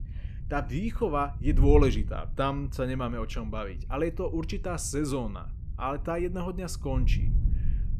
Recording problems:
wind noise on the microphone; occasional gusts; 20 dB below the speech

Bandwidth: 14 kHz